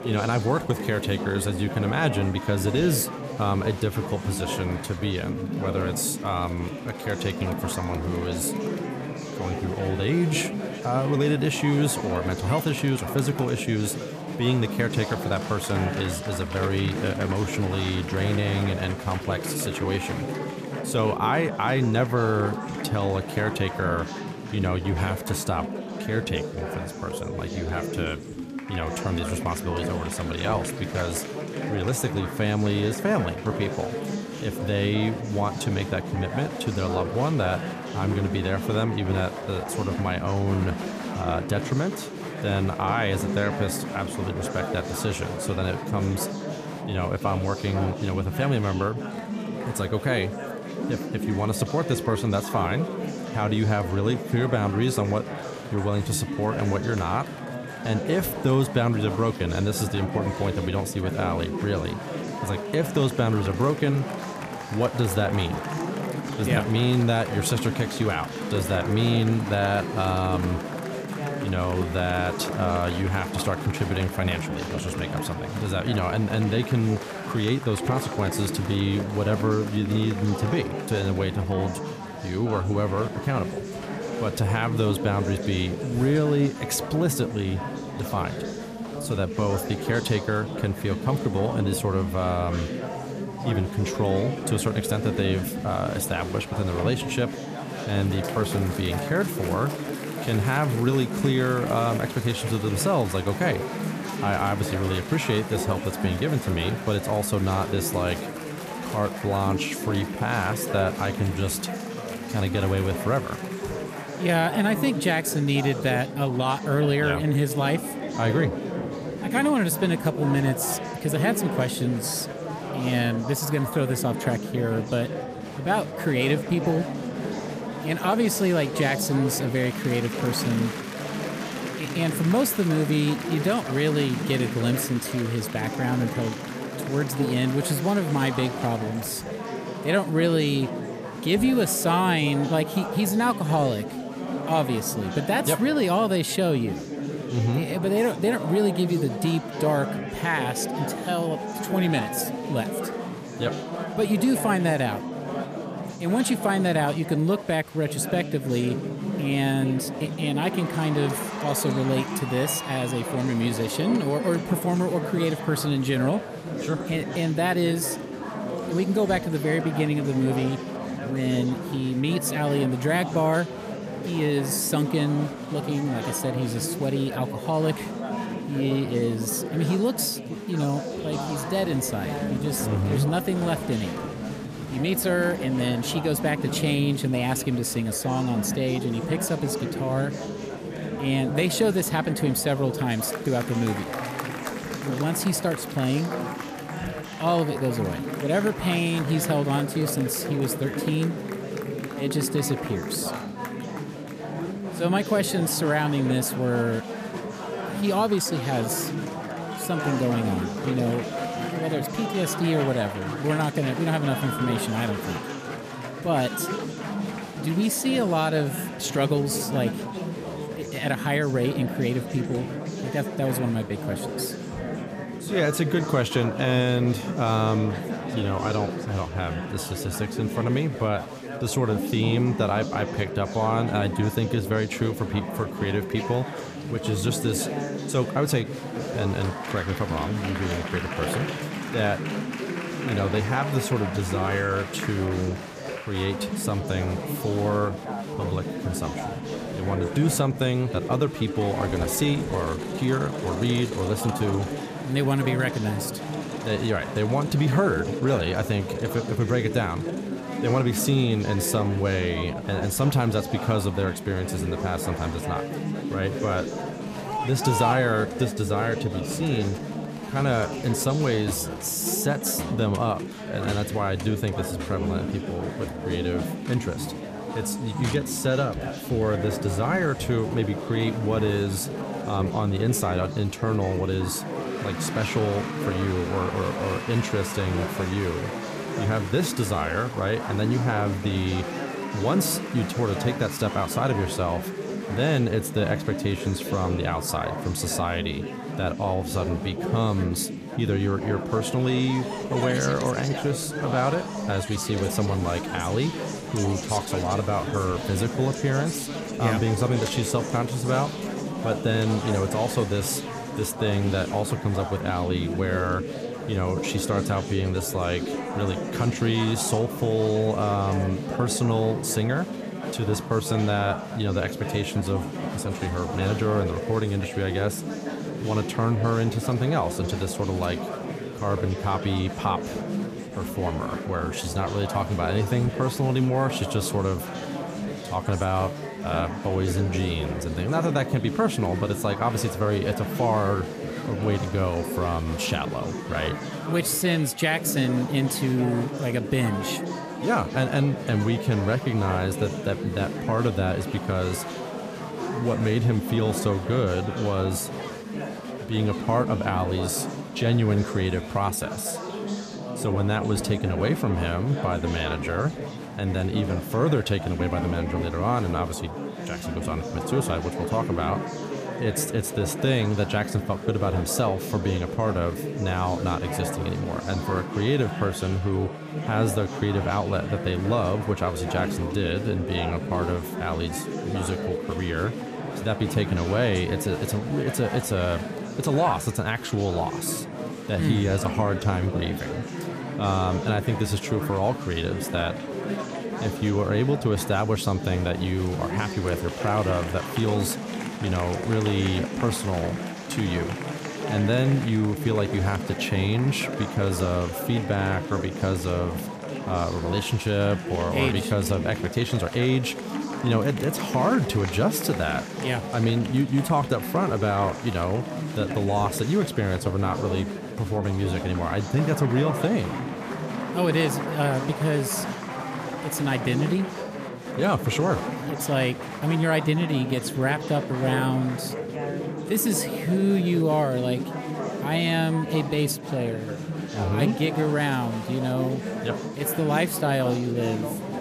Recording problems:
chatter from many people; loud; throughout; 6 dB below the speech

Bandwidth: 14.5 kHz